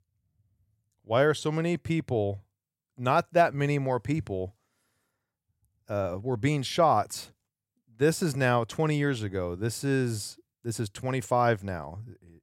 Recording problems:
none

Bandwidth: 16 kHz